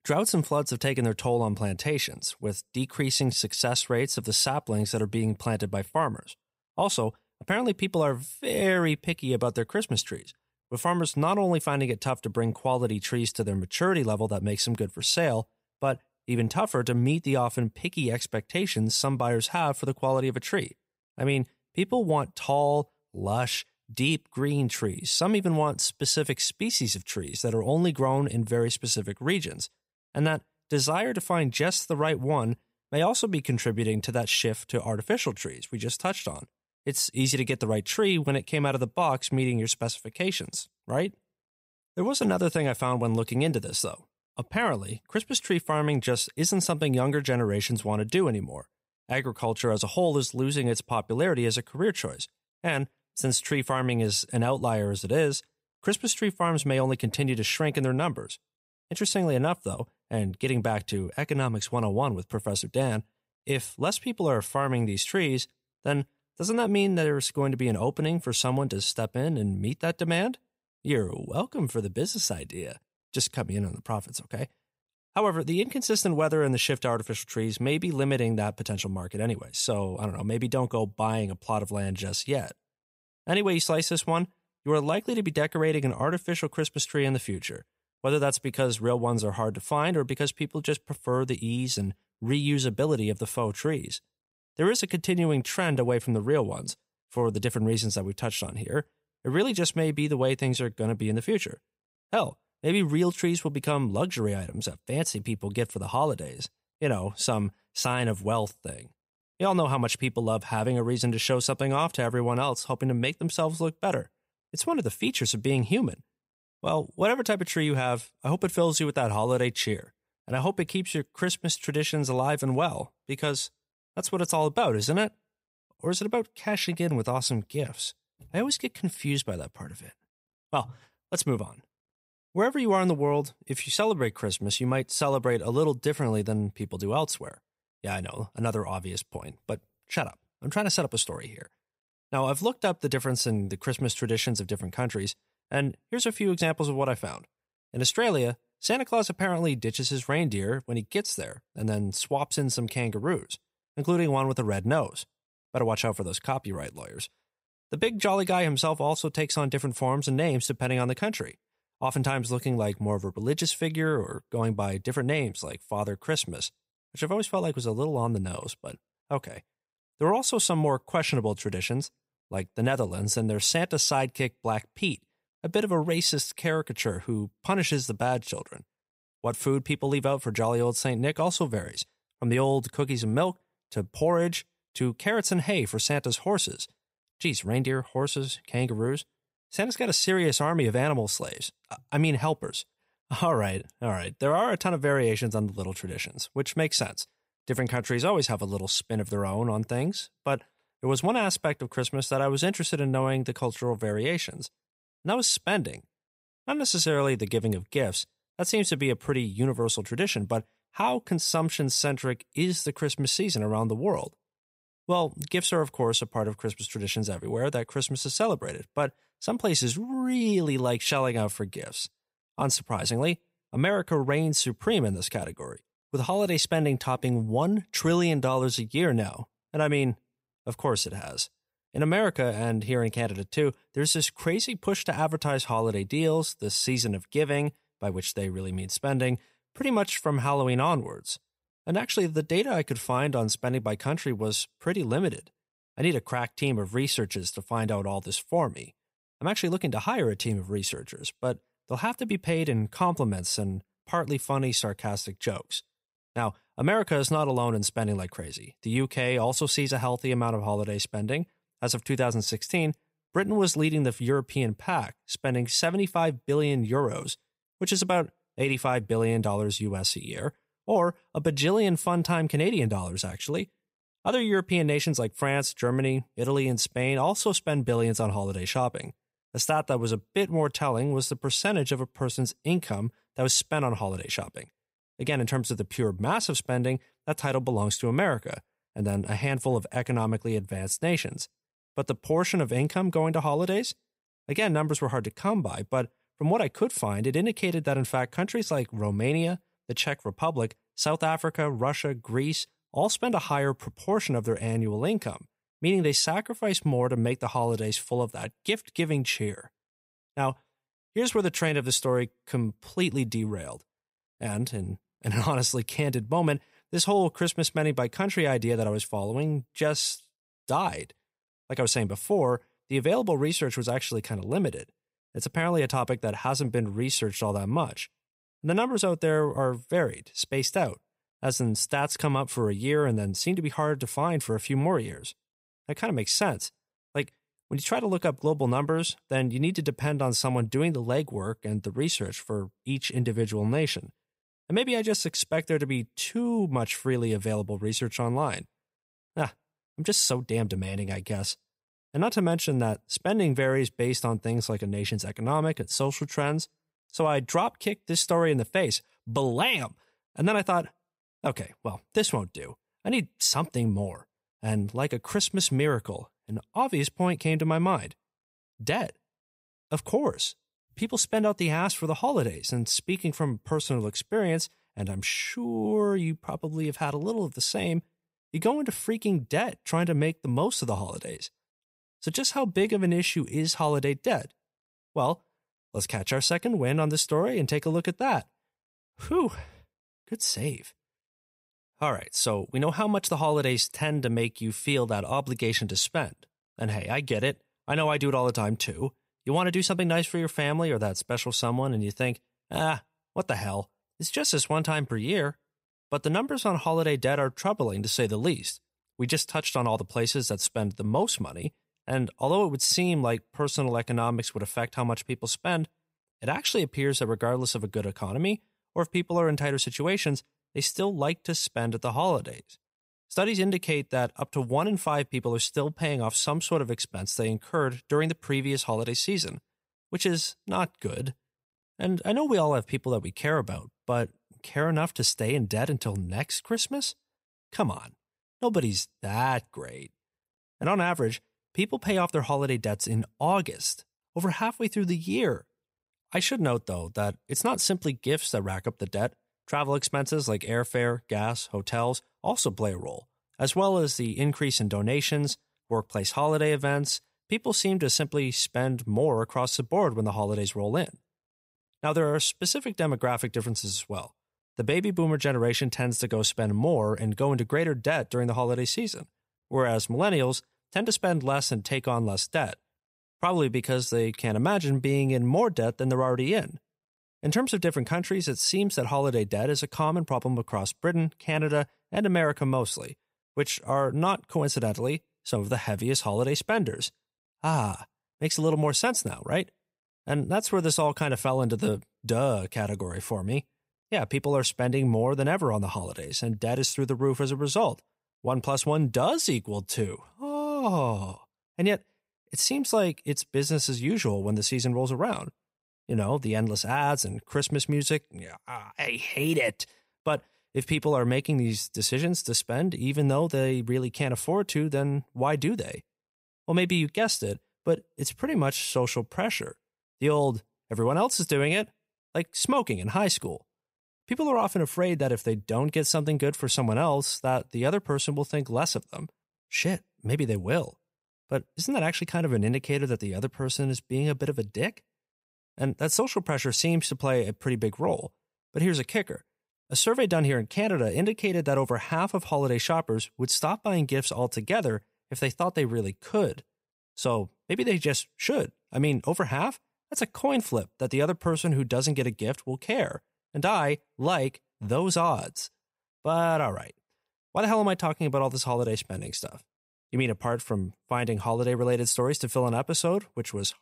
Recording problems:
none

